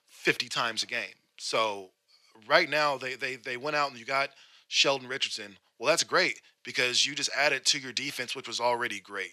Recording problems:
thin; somewhat; fading below 400 Hz

